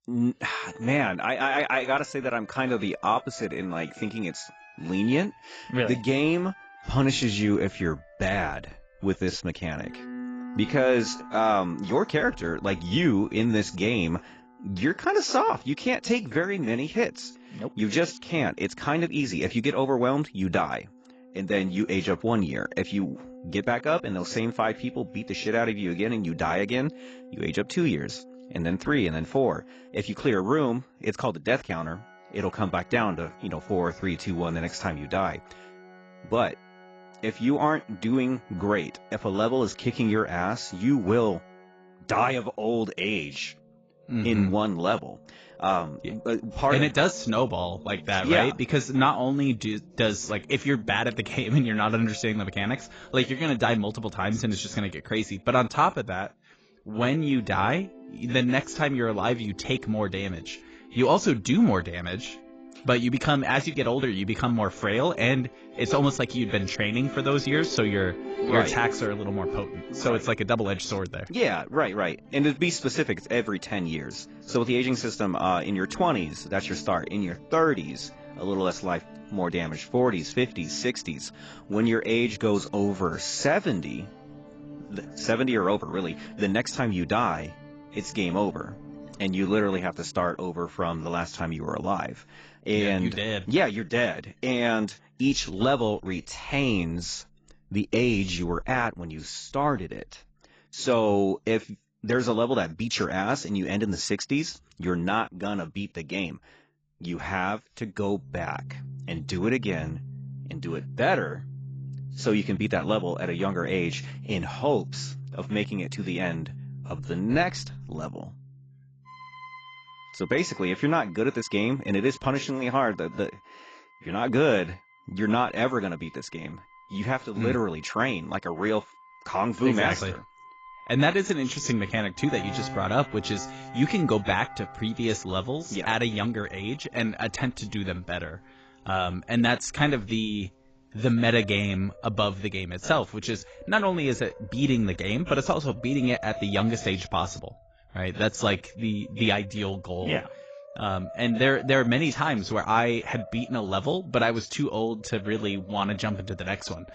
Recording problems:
garbled, watery; badly; nothing above 7.5 kHz
background music; noticeable; throughout; 15 dB below the speech

